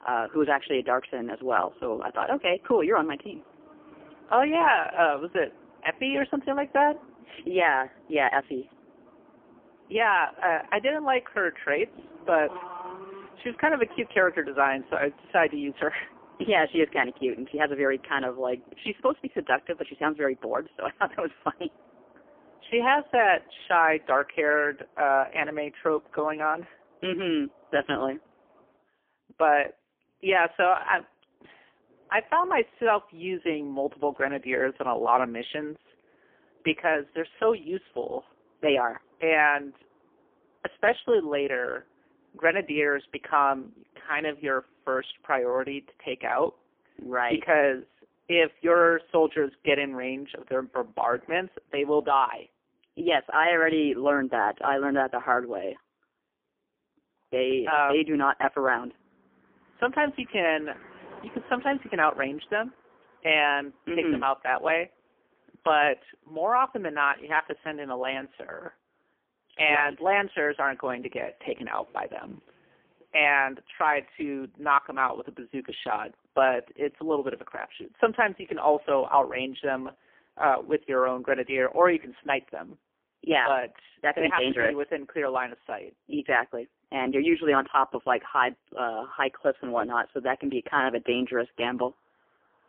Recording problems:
phone-call audio; poor line; nothing above 3 kHz
traffic noise; faint; throughout; 25 dB below the speech

